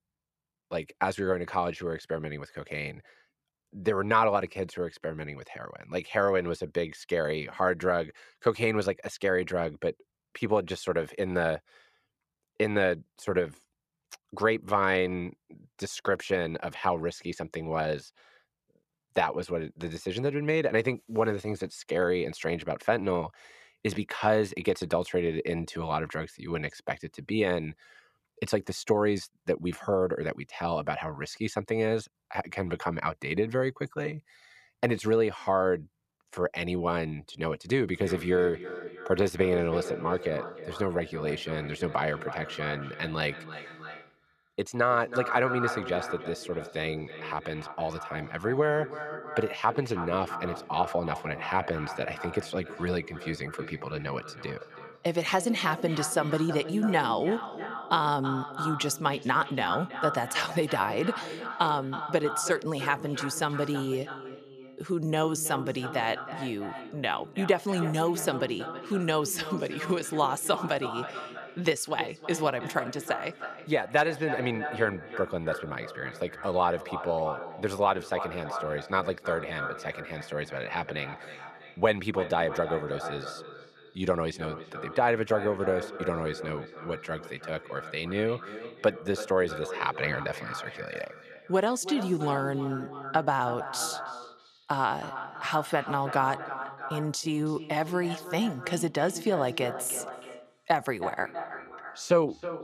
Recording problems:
echo of what is said; strong; from 38 s on; 320 ms later, 10 dB below the speech

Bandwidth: 14.5 kHz